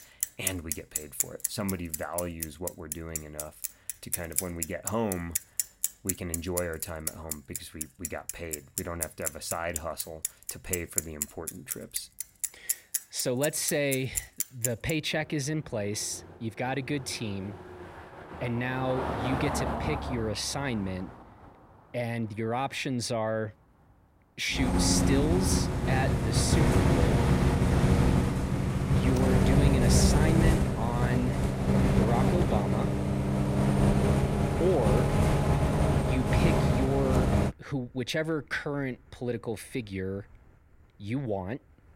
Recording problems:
traffic noise; very loud; throughout; 4 dB above the speech

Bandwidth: 16 kHz